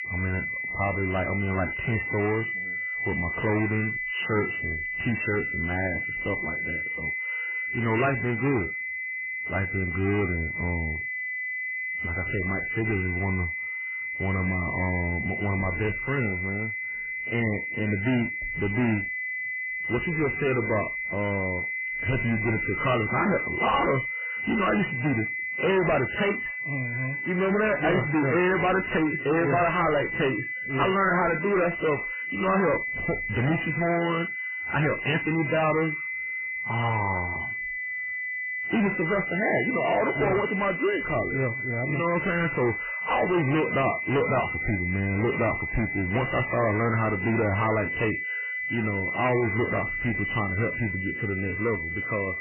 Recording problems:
distortion; heavy; 13% of the sound clipped
garbled, watery; badly; nothing above 3 kHz
high-pitched whine; loud; throughout; 2 kHz, 3 dB below the speech

